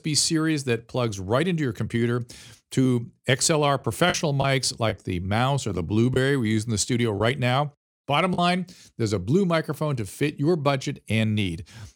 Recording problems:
choppy; occasionally; from 4 to 6 s and from 7 to 8.5 s; 4% of the speech affected

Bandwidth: 17 kHz